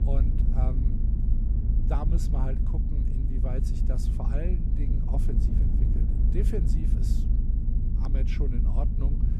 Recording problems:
low rumble; loud; throughout; 1 dB below the speech
electrical hum; faint; throughout; 60 Hz, 25 dB below the speech

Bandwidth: 15 kHz